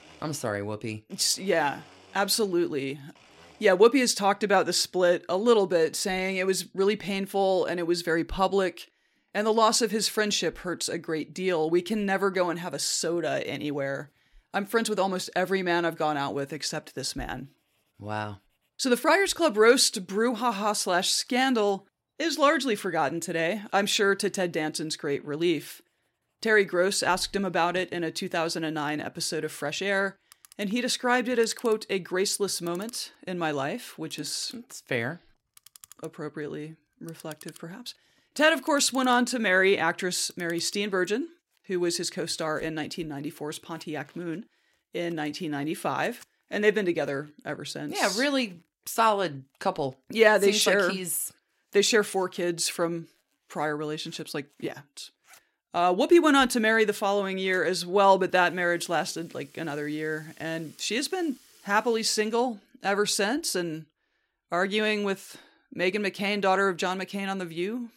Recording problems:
household noises; faint; throughout; 30 dB below the speech

